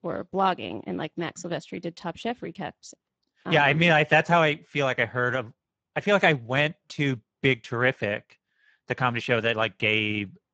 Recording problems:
garbled, watery; badly; nothing above 7.5 kHz

